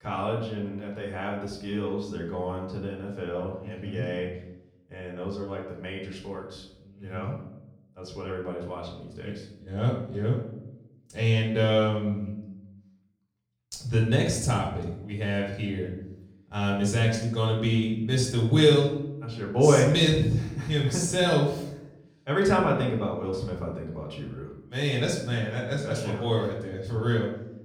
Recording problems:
off-mic speech; far
room echo; noticeable; dies away in 0.7 s

